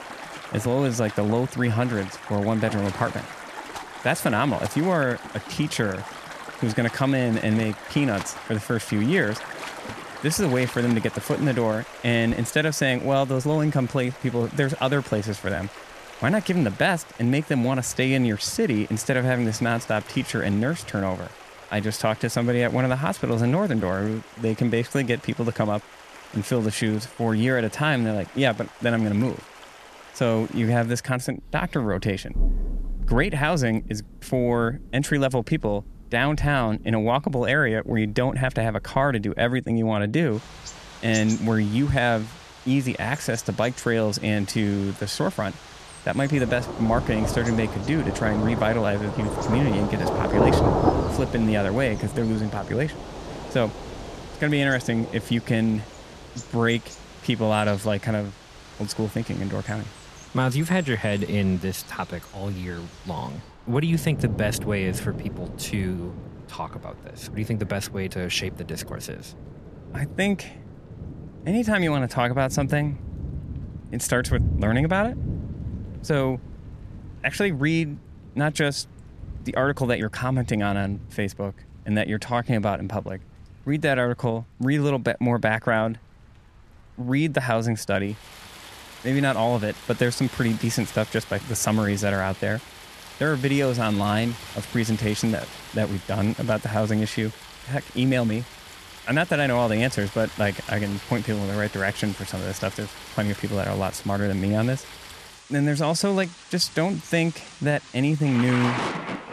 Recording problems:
rain or running water; noticeable; throughout; 10 dB below the speech

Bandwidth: 14 kHz